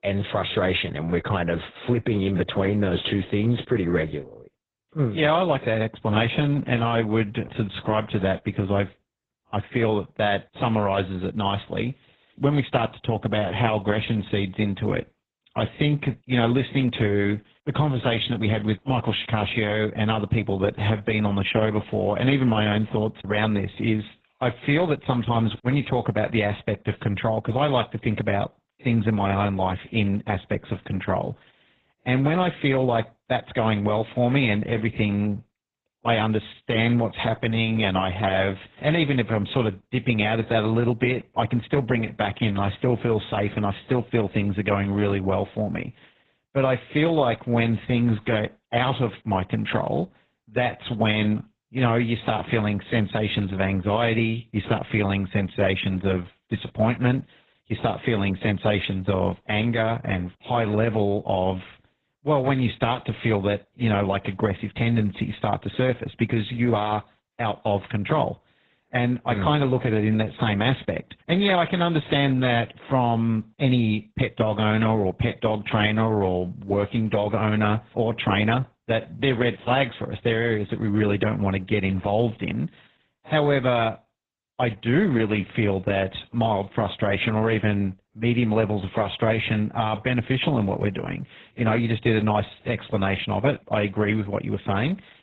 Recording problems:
garbled, watery; badly; nothing above 4 kHz

